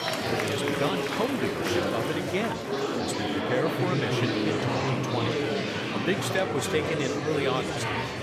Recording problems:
murmuring crowd; very loud; throughout; 4 dB above the speech

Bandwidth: 14.5 kHz